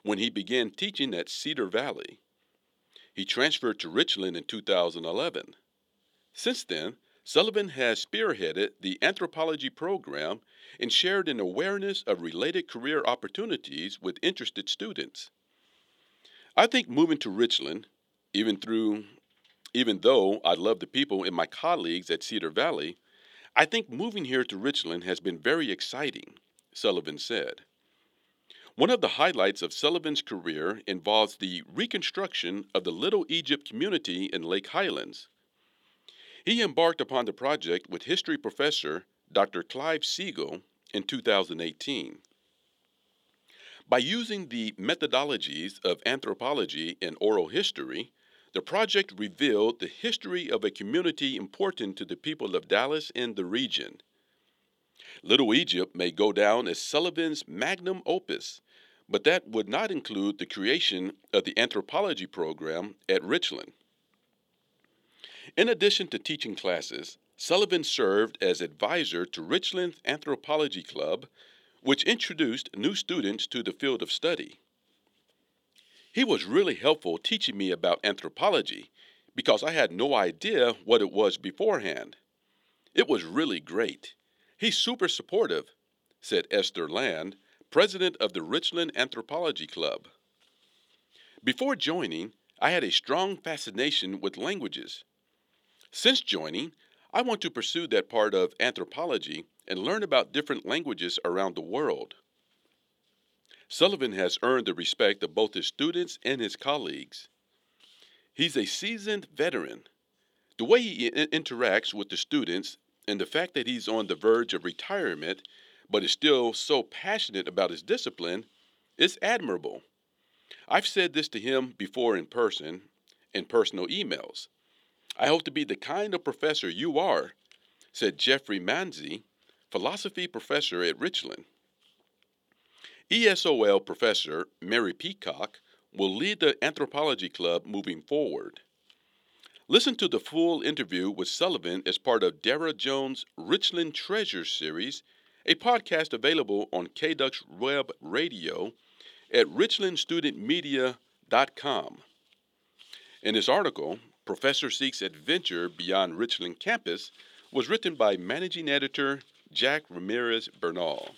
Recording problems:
thin; very slightly; fading below 300 Hz

